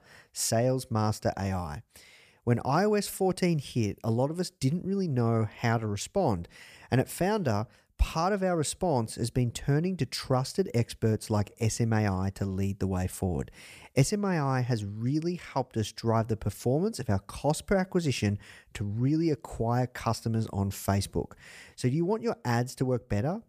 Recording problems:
none

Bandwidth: 15 kHz